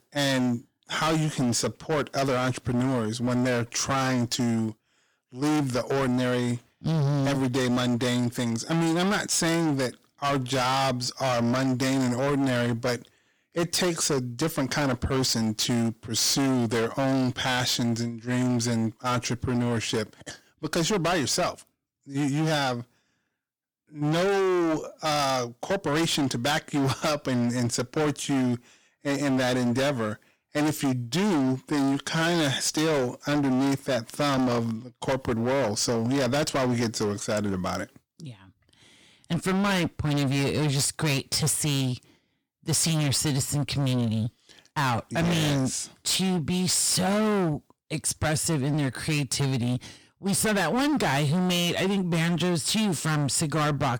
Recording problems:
distortion; heavy; 26% of the sound clipped

